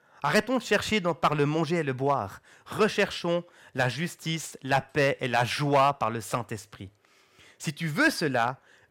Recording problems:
distortion; slight; 1.4% of the sound clipped

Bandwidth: 16.5 kHz